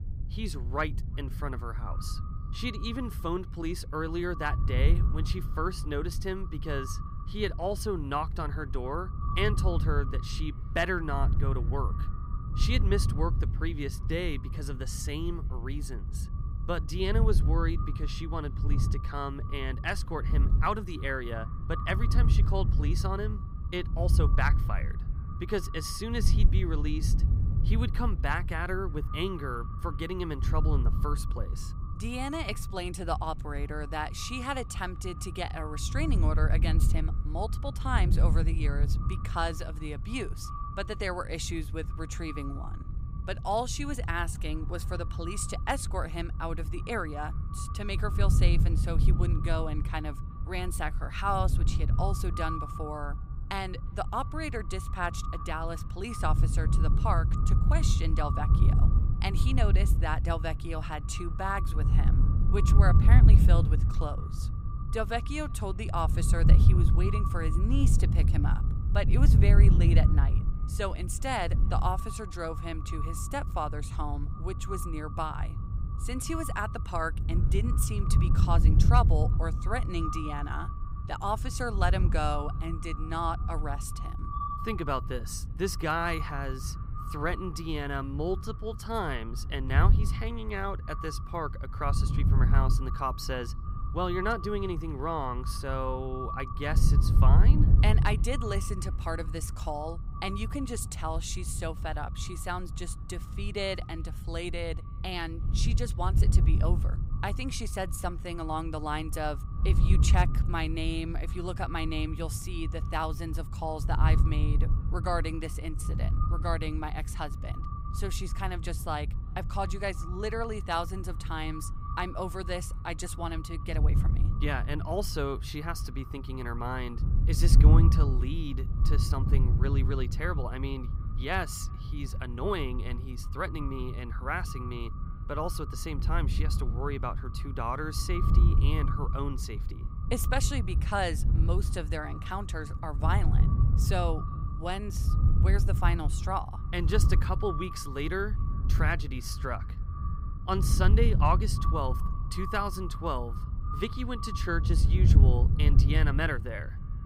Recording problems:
echo of what is said; noticeable; throughout; 360 ms later, 10 dB below the speech
wind noise on the microphone; occasional gusts; 10 dB below the speech

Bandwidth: 15.5 kHz